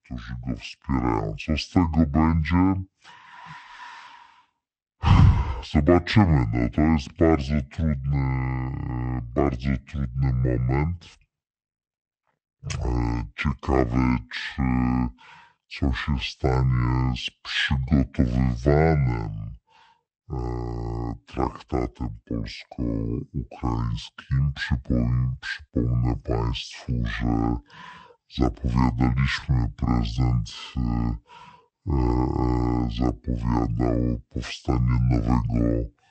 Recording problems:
wrong speed and pitch; too slow and too low; 0.6 times normal speed

